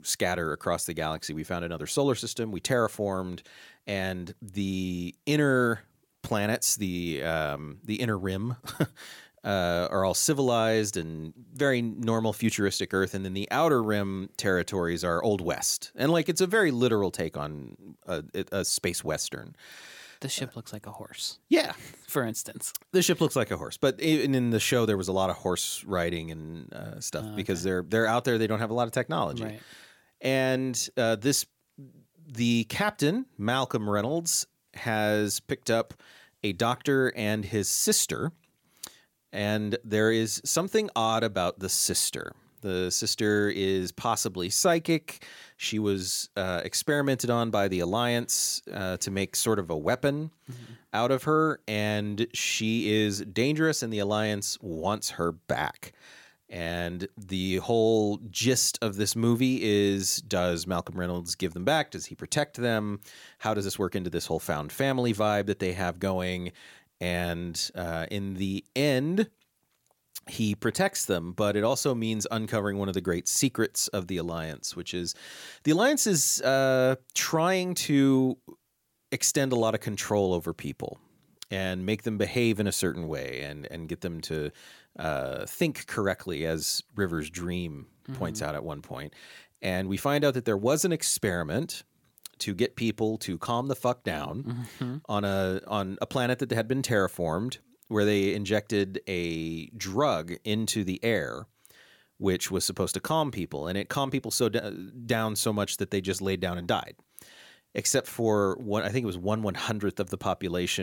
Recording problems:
abrupt cut into speech; at the end

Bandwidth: 17 kHz